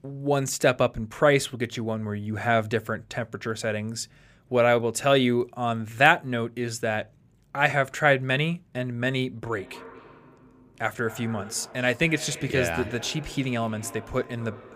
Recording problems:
echo of what is said; faint; from 9.5 s on; 240 ms later, 20 dB below the speech

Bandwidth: 15 kHz